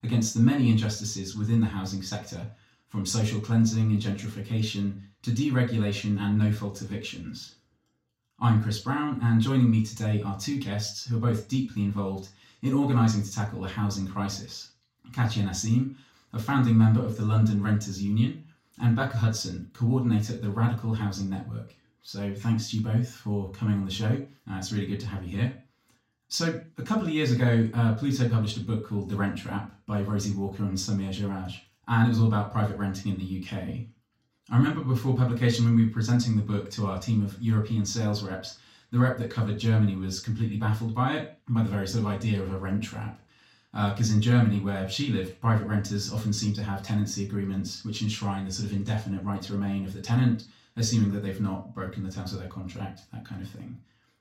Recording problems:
off-mic speech; far
room echo; slight; dies away in 0.3 s

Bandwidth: 16 kHz